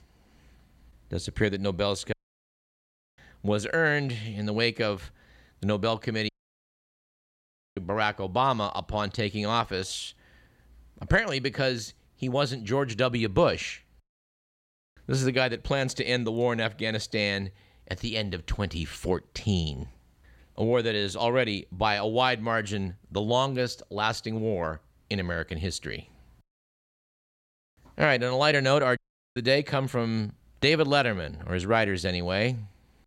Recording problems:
audio cutting out; at 2 s for 1 s, at 6.5 s for 1.5 s and at 29 s

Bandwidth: 16 kHz